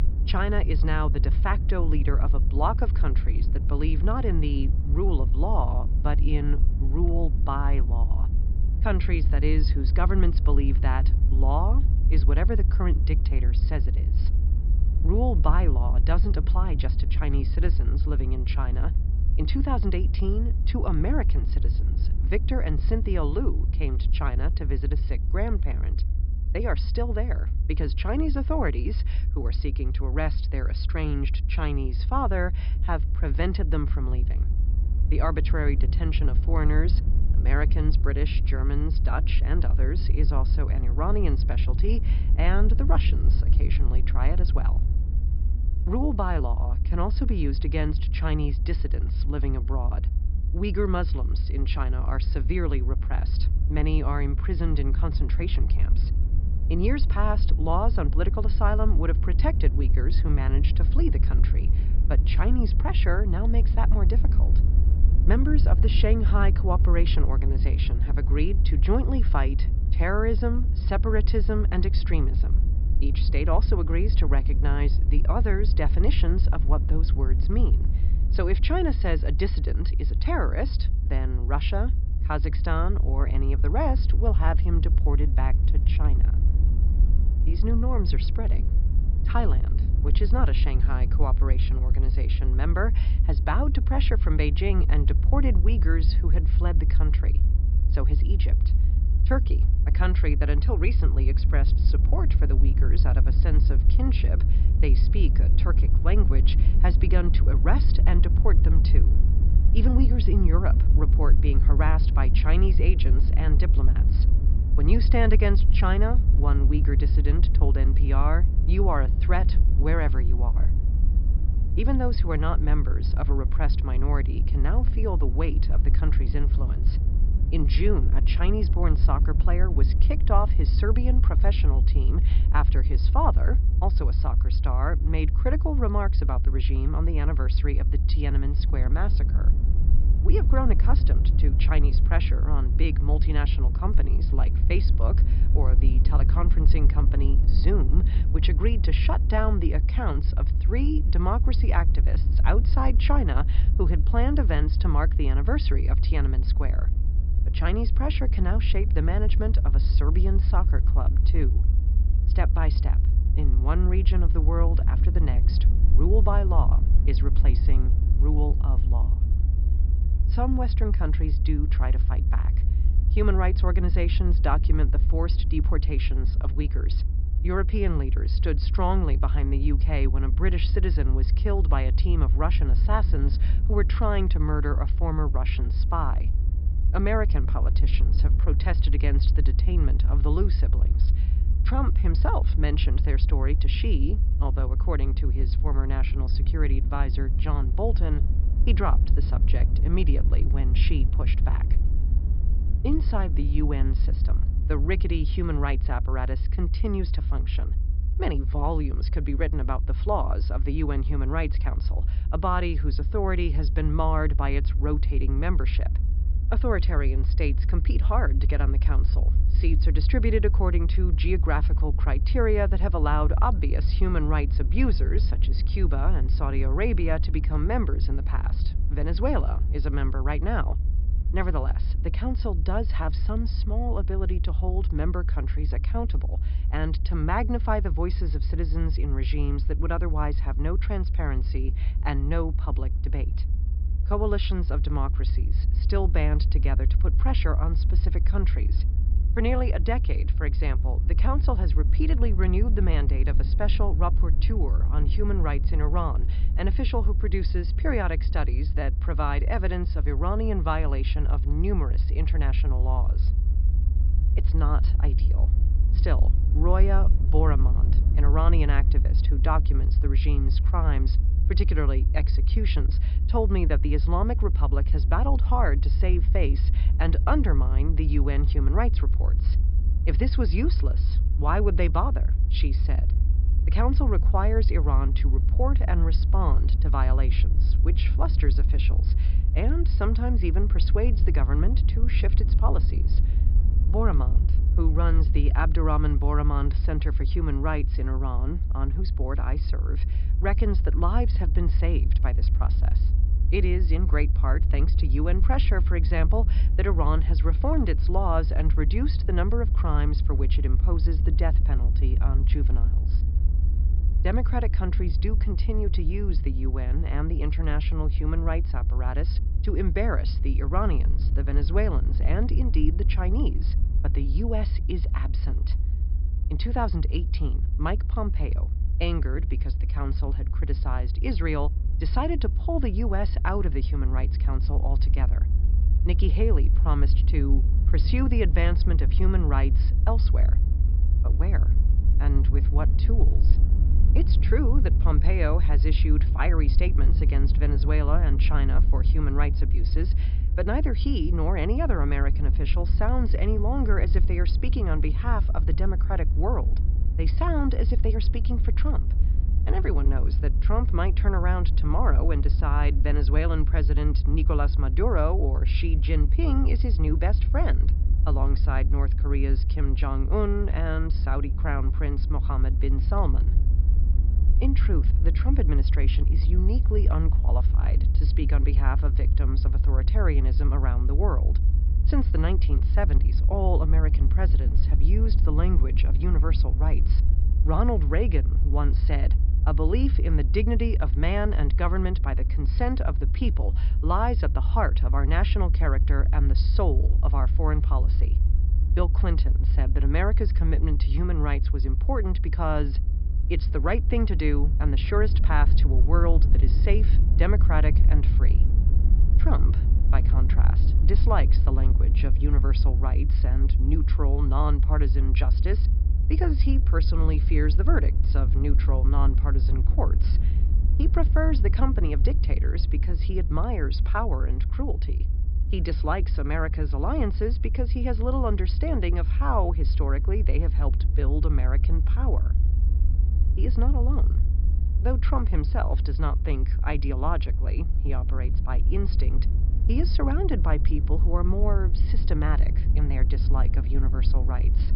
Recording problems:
high frequencies cut off; noticeable; nothing above 5.5 kHz
low rumble; noticeable; throughout; 10 dB below the speech

